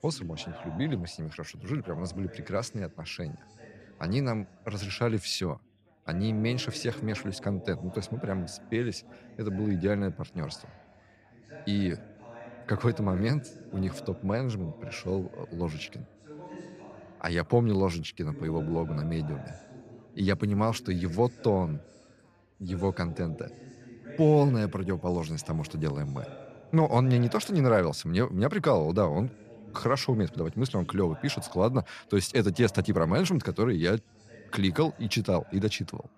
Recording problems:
background chatter; noticeable; throughout; 4 voices, 20 dB below the speech

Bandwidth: 14.5 kHz